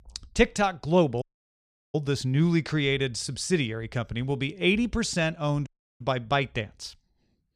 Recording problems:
audio cutting out; at 1 s for 0.5 s and at 5.5 s

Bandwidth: 14.5 kHz